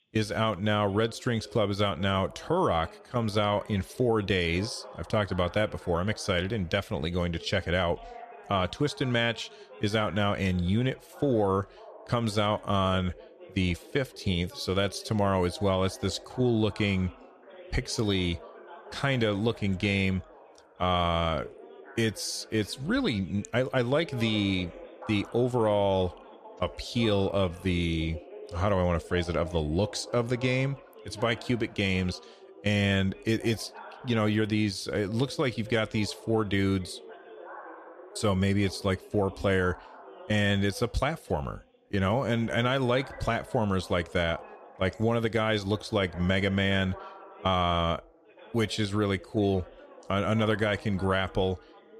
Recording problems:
background chatter; noticeable; throughout; 2 voices, 20 dB below the speech

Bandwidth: 14.5 kHz